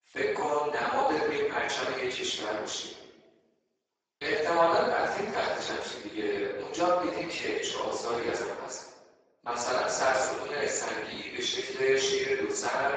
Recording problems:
room echo; strong; dies away in 1.1 s
off-mic speech; far
garbled, watery; badly; nothing above 7.5 kHz
thin; very; fading below 400 Hz

